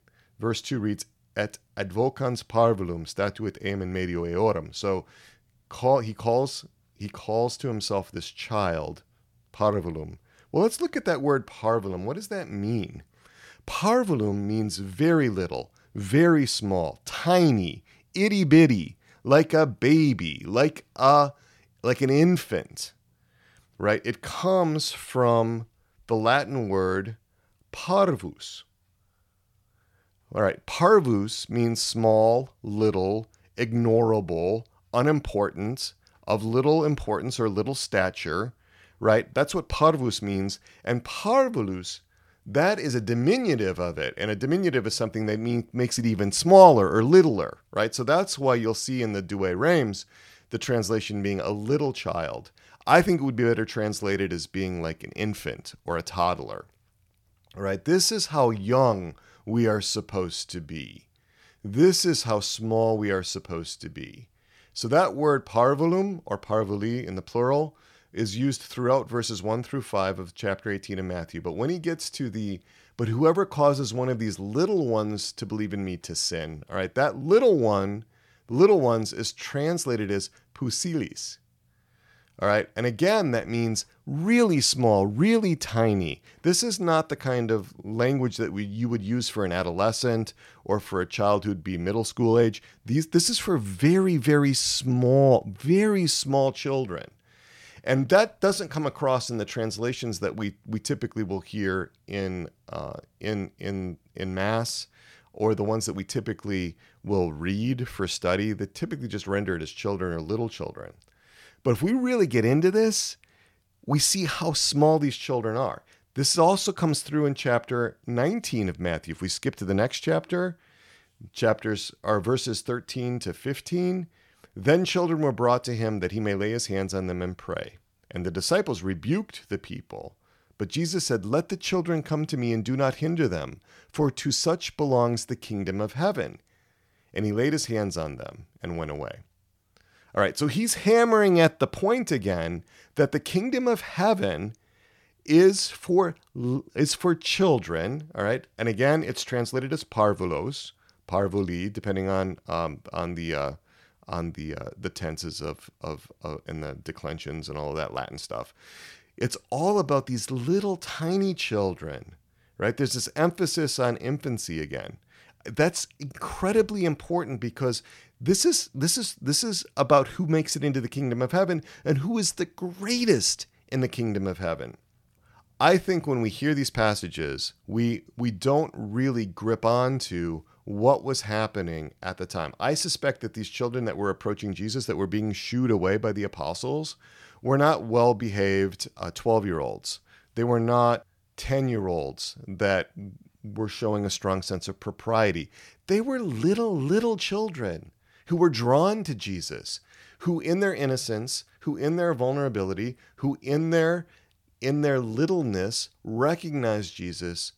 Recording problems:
none

